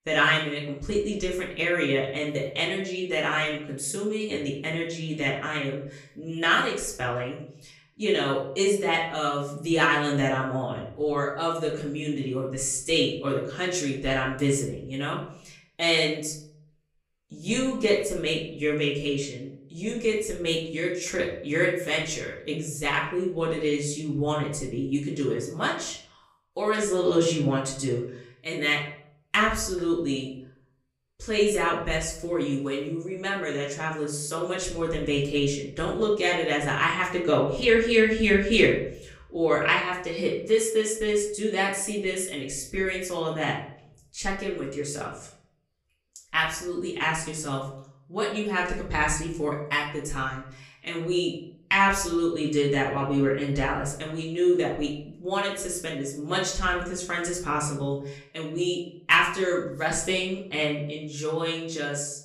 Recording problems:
off-mic speech; far
room echo; slight; dies away in 0.5 s

